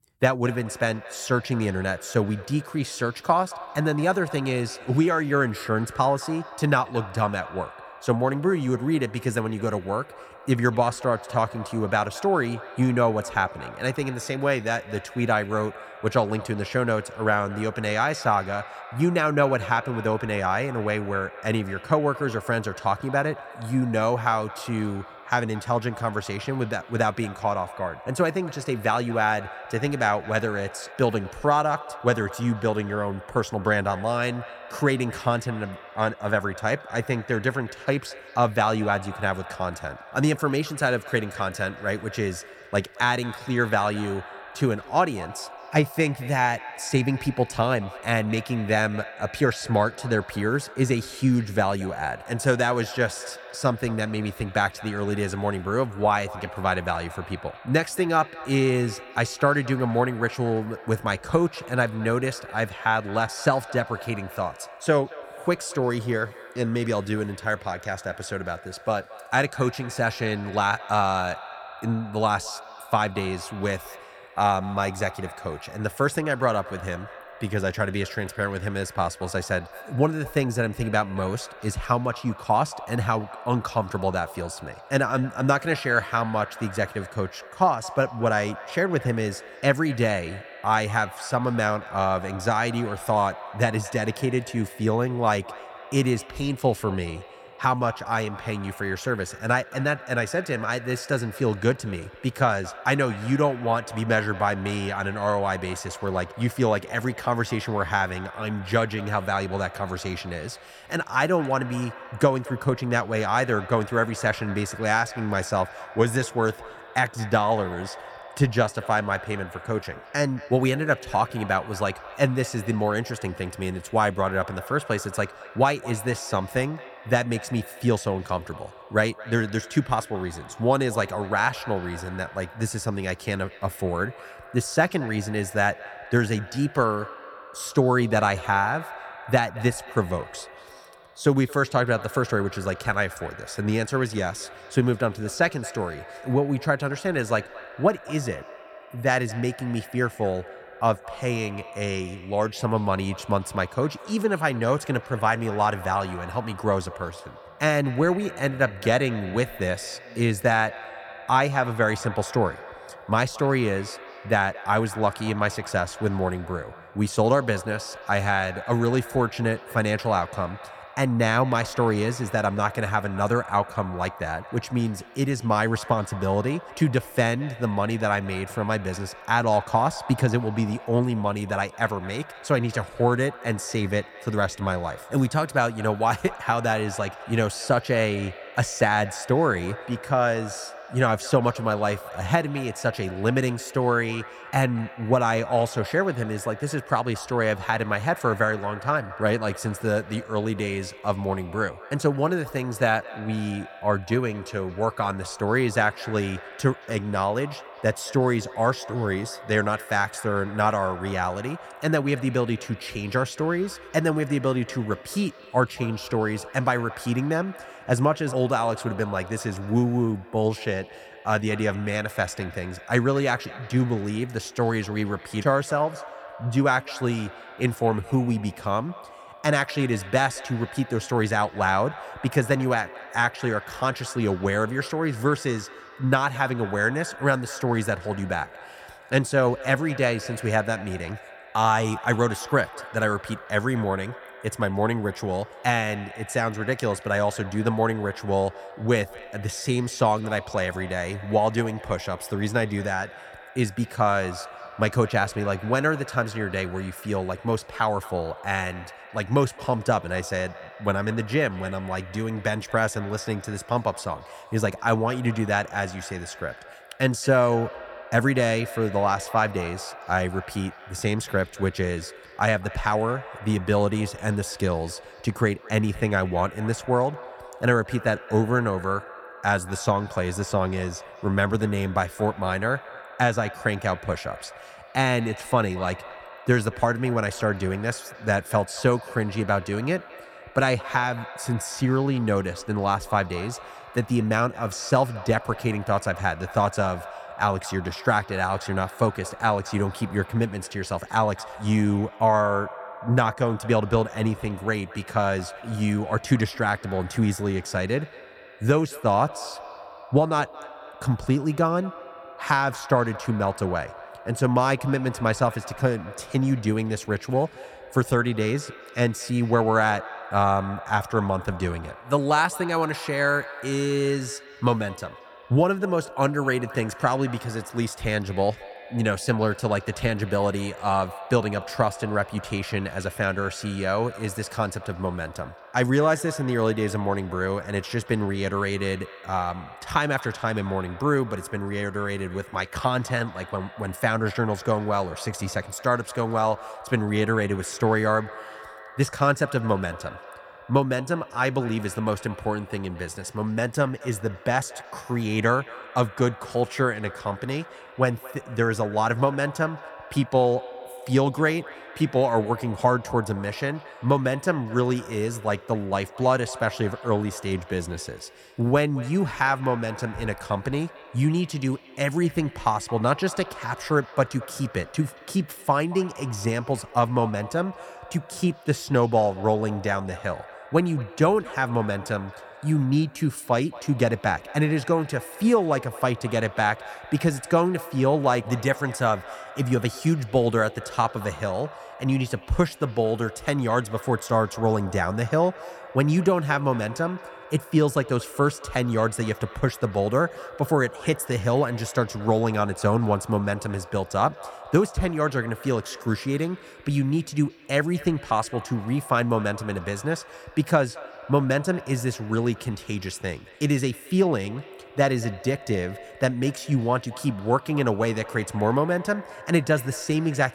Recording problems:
echo of what is said; noticeable; throughout; 220 ms later, 15 dB below the speech

